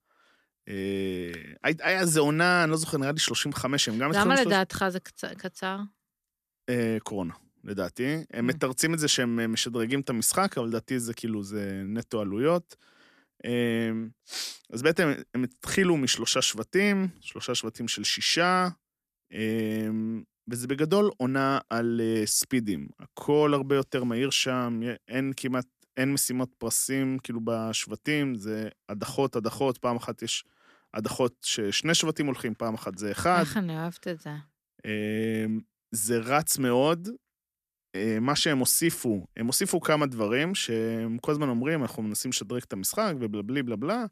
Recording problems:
none

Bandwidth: 14.5 kHz